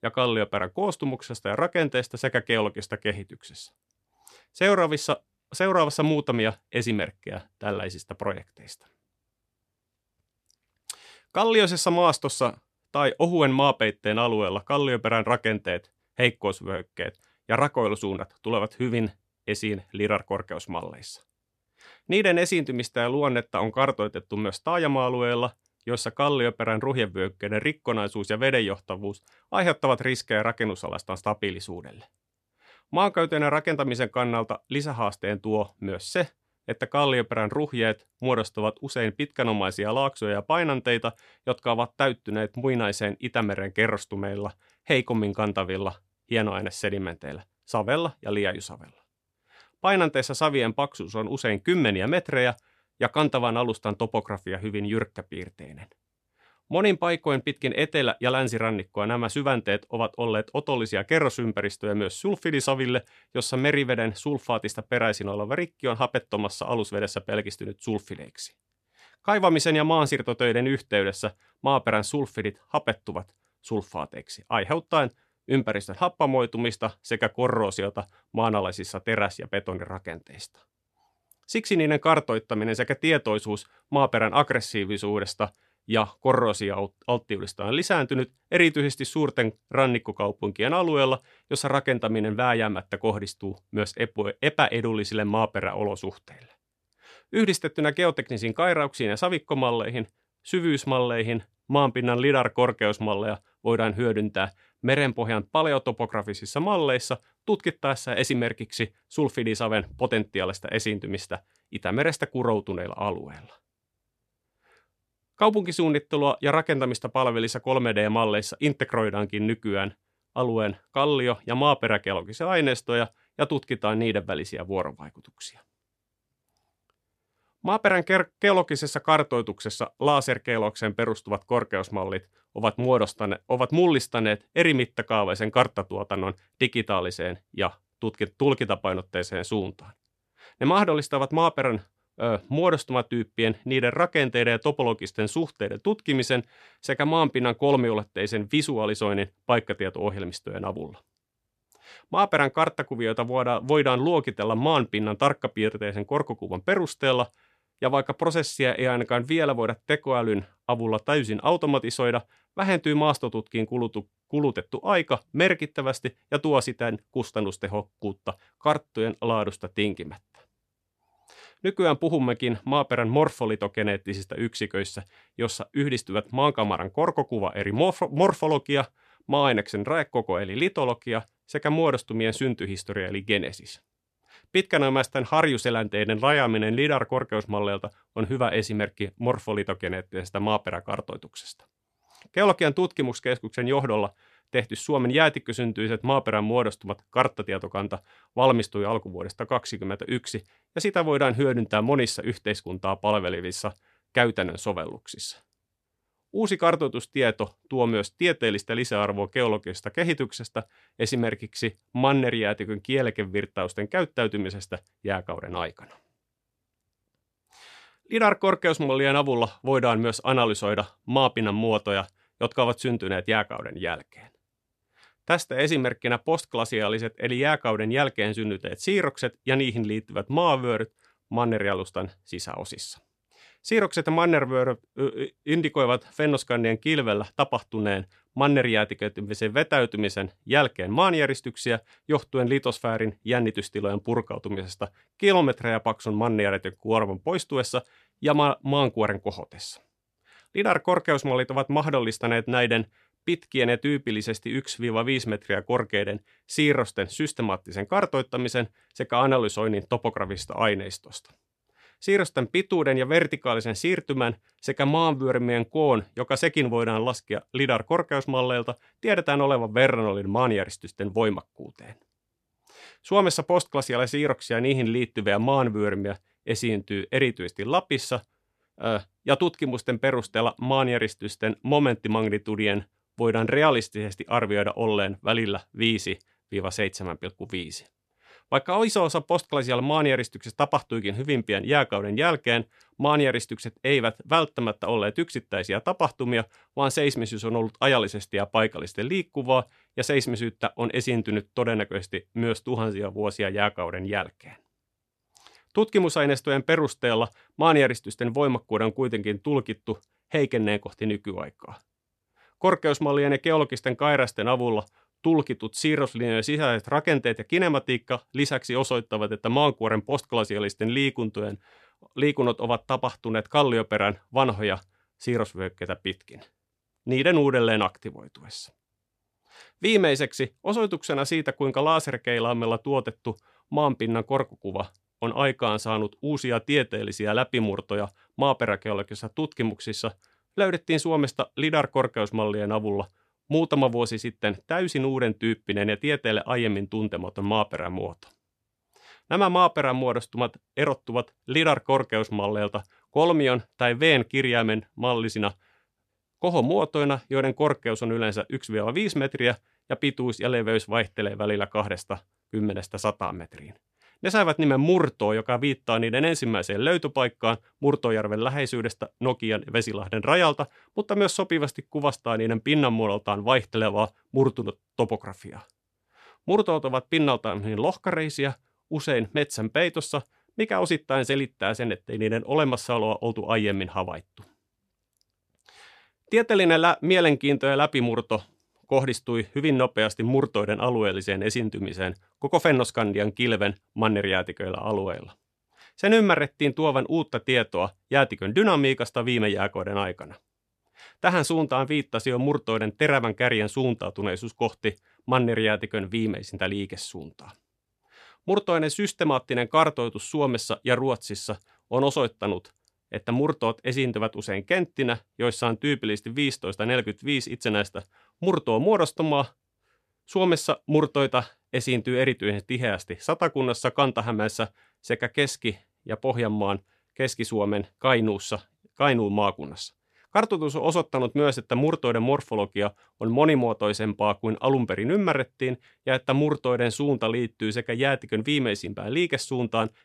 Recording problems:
none

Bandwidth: 14 kHz